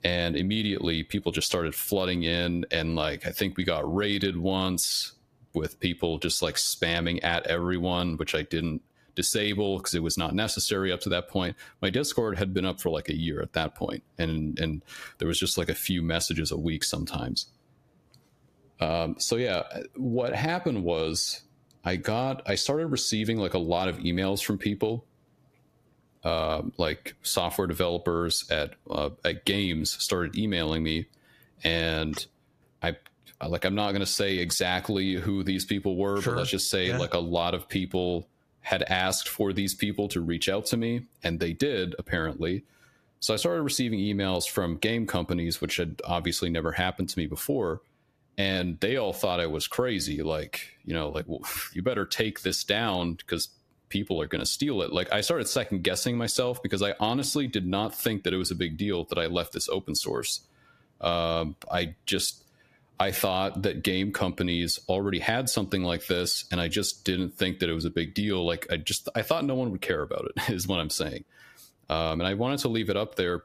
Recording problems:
squashed, flat; somewhat

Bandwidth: 14.5 kHz